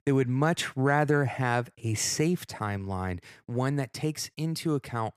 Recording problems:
none

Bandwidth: 14.5 kHz